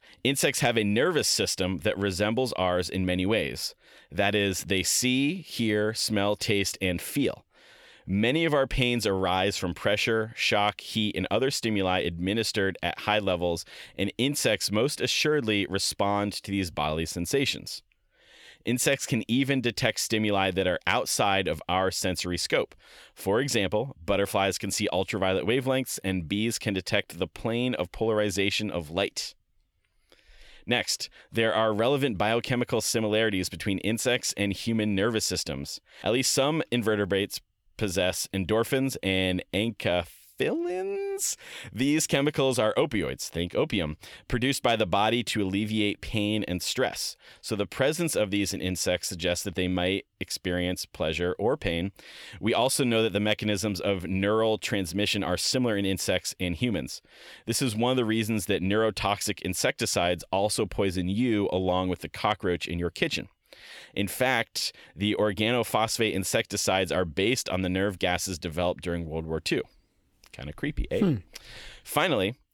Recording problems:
none

